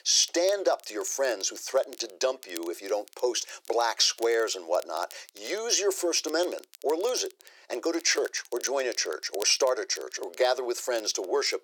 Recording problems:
thin; very; fading below 350 Hz
crackle, like an old record; faint; 20 dB below the speech

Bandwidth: 18 kHz